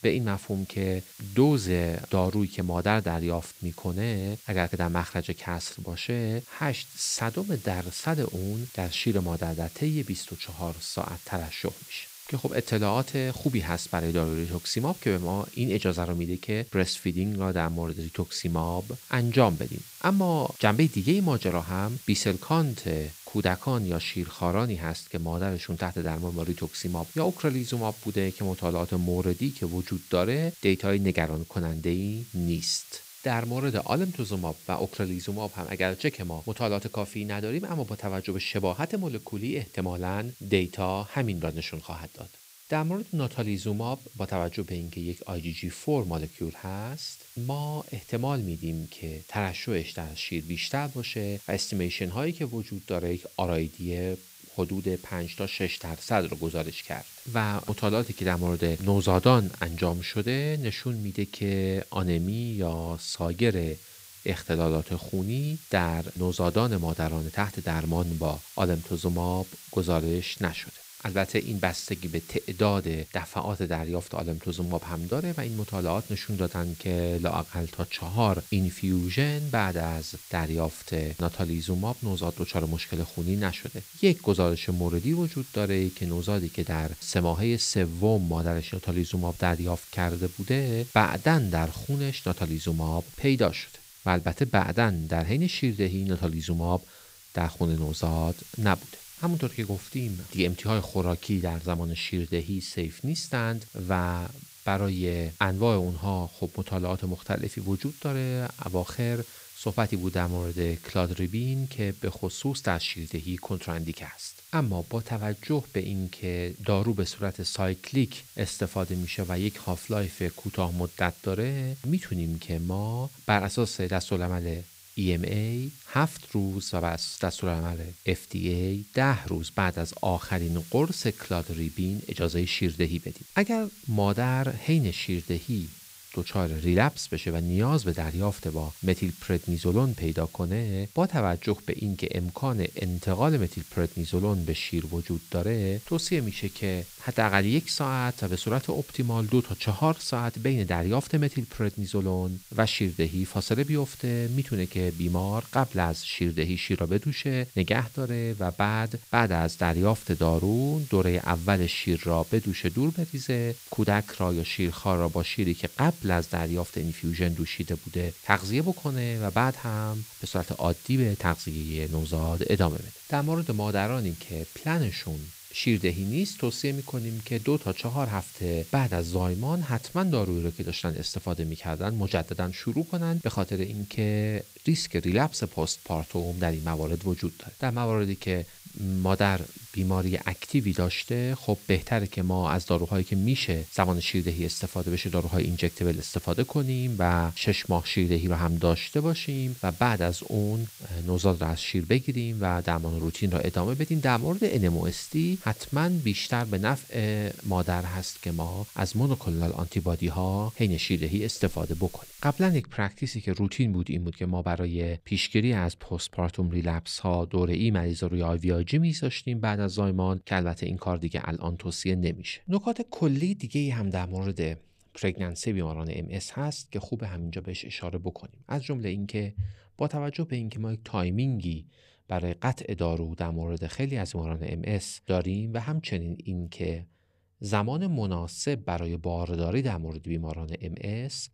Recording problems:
hiss; noticeable; until 3:33; 15 dB below the speech

